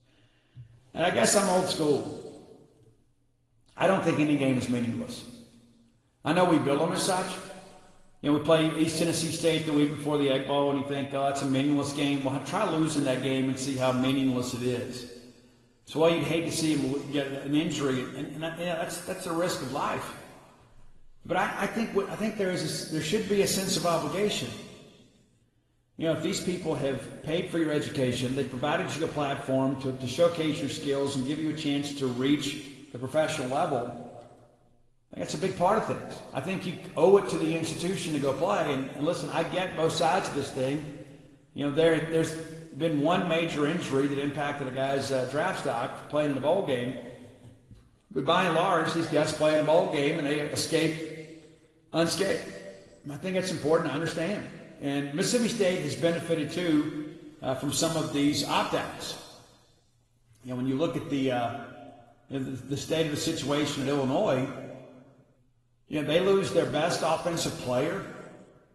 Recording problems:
room echo; noticeable; dies away in 1.5 s
off-mic speech; somewhat distant
garbled, watery; slightly; nothing above 15.5 kHz

